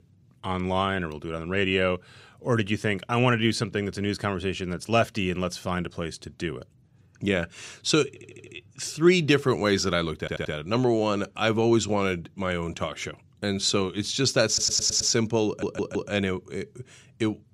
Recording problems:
audio stuttering; 4 times, first at 8 s

